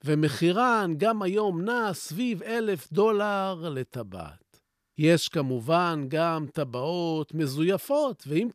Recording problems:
none

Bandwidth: 14.5 kHz